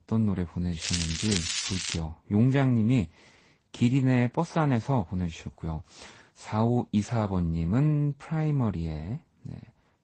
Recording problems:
garbled, watery; slightly; nothing above 8 kHz
crackling; loud; from 1 to 2 s; 2 dB below the speech

